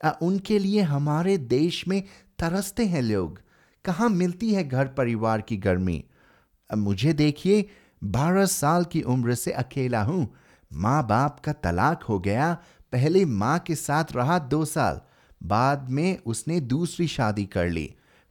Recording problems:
none

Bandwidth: 18.5 kHz